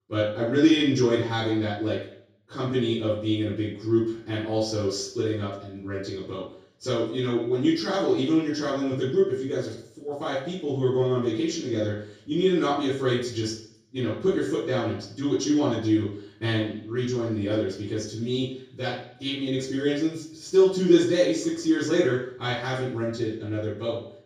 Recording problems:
off-mic speech; far
room echo; noticeable; dies away in 0.6 s

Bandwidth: 15 kHz